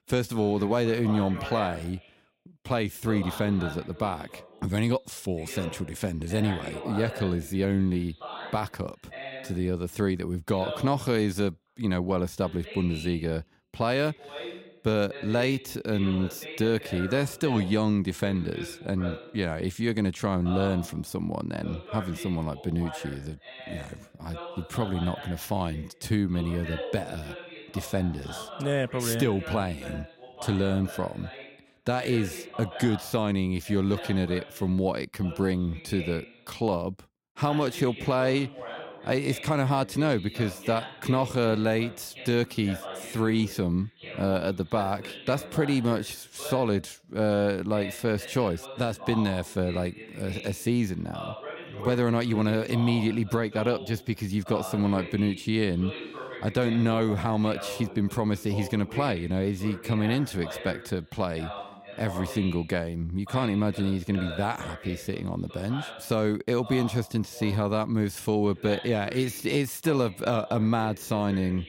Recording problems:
voice in the background; noticeable; throughout; 15 dB below the speech

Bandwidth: 16 kHz